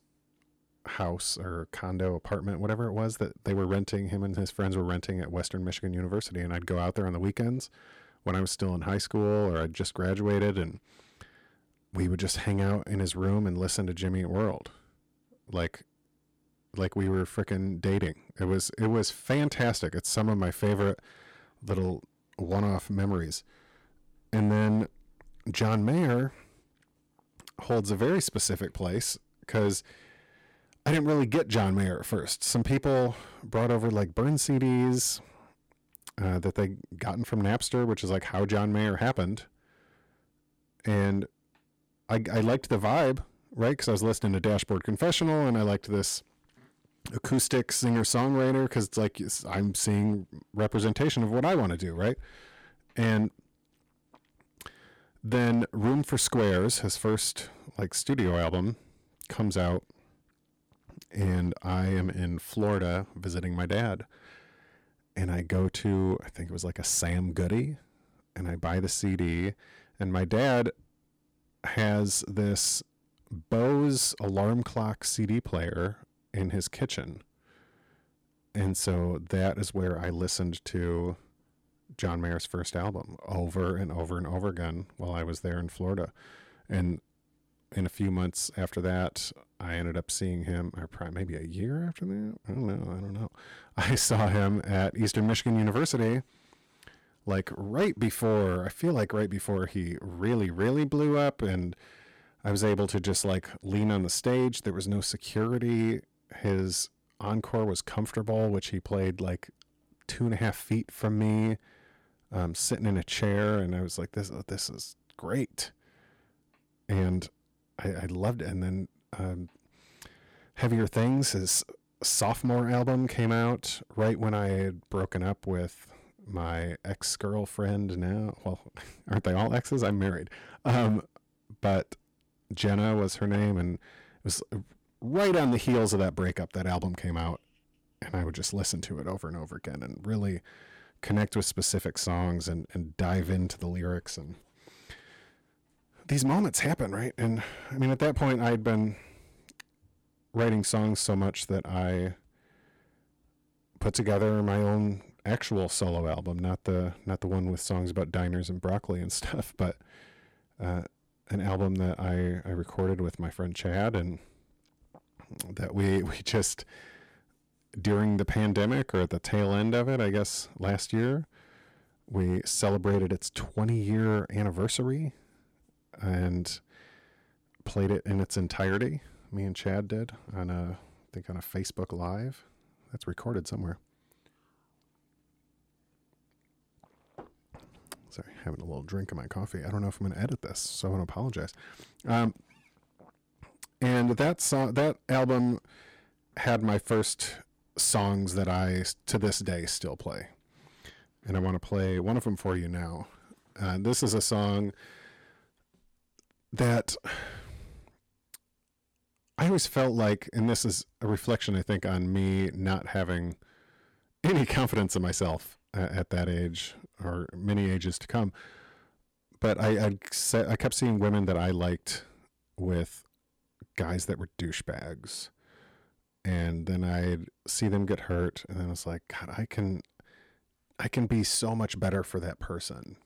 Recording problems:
distortion; slight; 4% of the sound clipped

